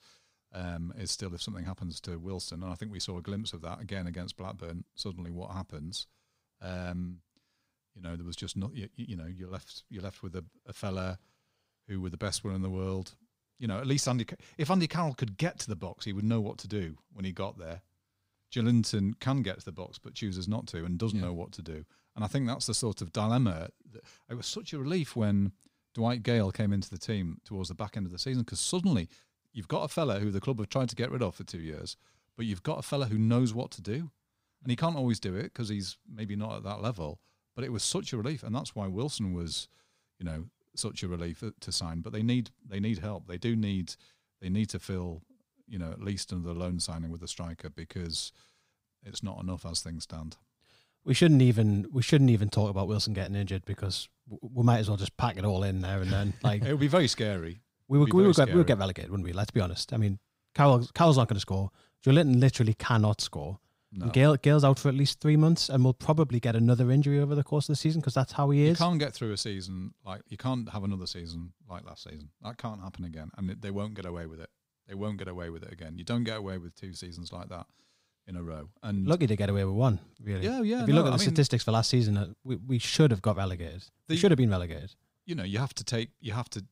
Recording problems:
none

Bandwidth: 15.5 kHz